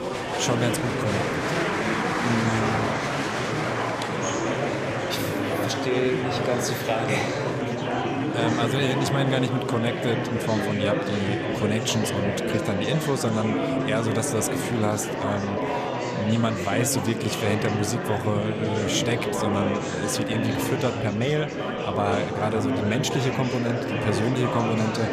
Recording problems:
murmuring crowd; very loud; throughout; as loud as the speech

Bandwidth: 14.5 kHz